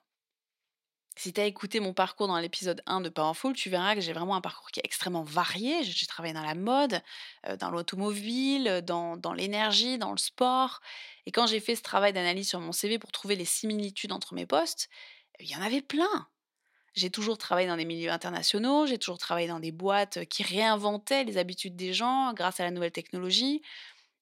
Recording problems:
thin; very slightly; fading below 950 Hz

